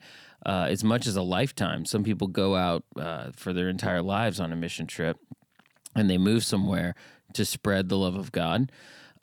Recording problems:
none

